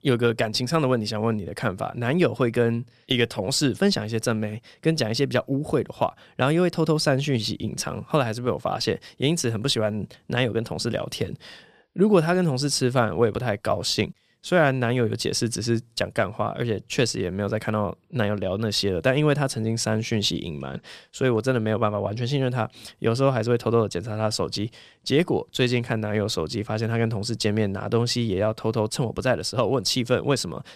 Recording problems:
none

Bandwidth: 14.5 kHz